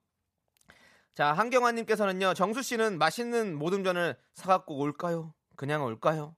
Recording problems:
none

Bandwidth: 14.5 kHz